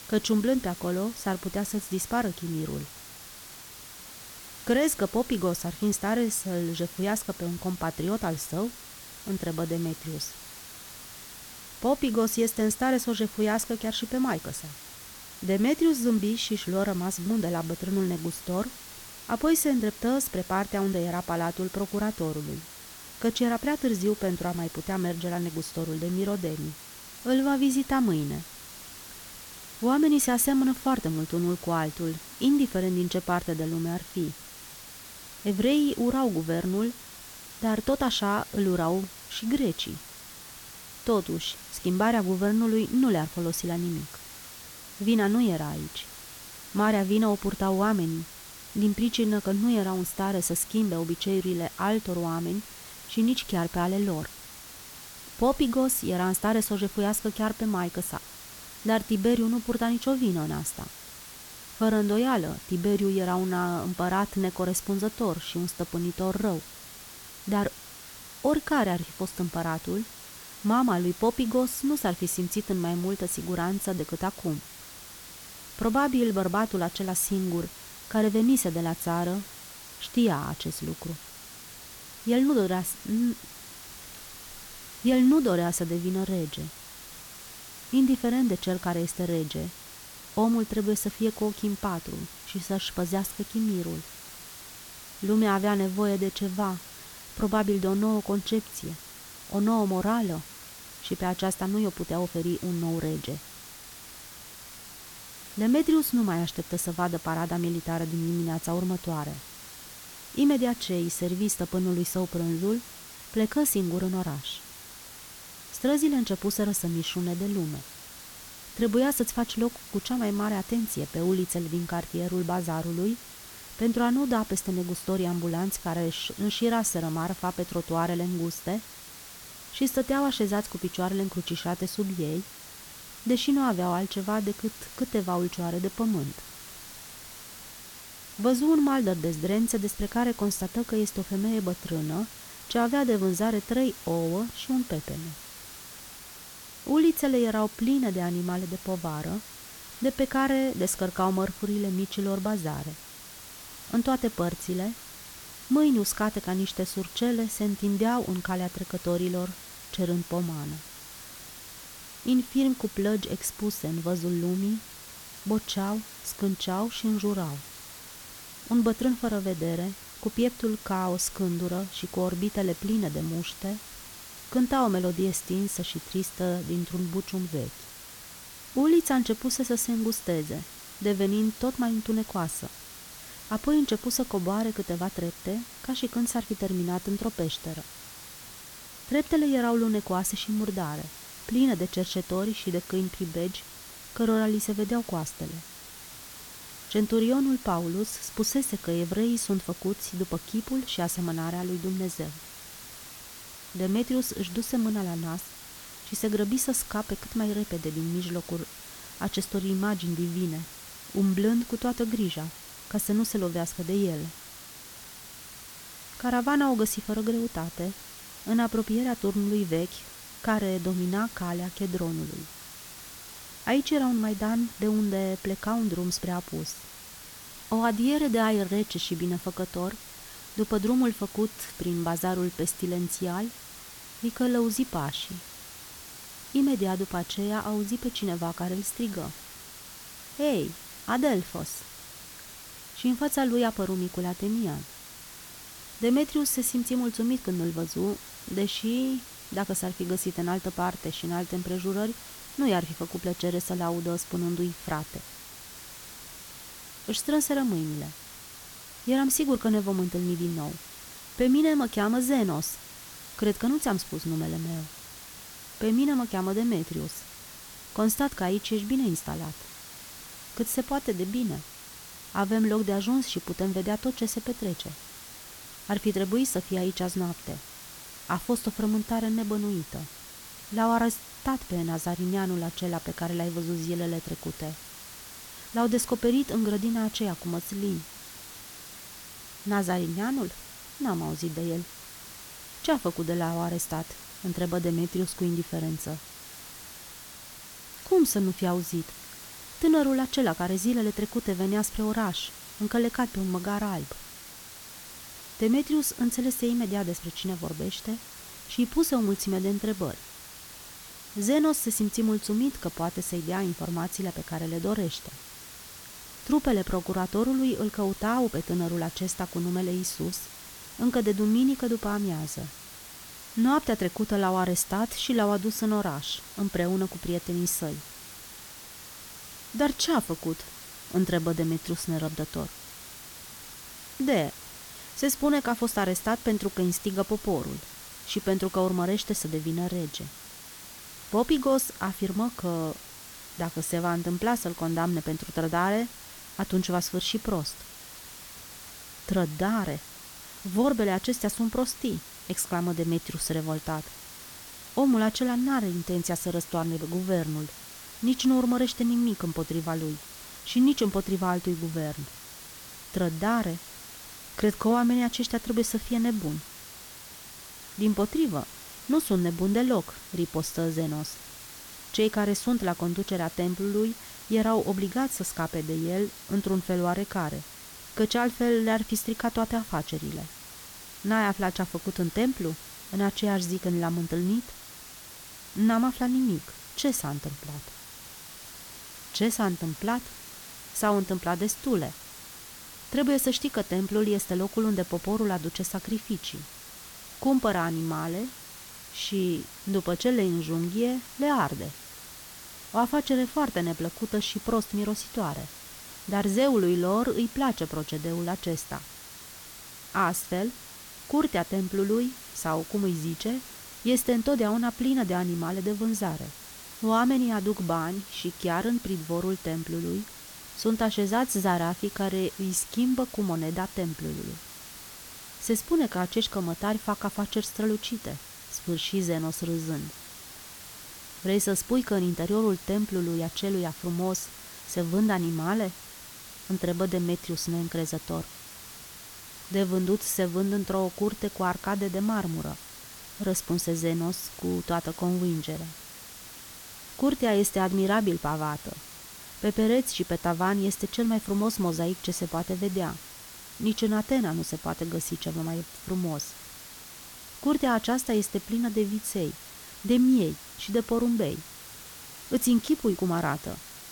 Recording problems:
hiss; noticeable; throughout; 15 dB below the speech

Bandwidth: 18 kHz